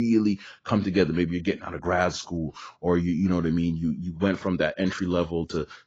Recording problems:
garbled, watery; badly
abrupt cut into speech; at the start

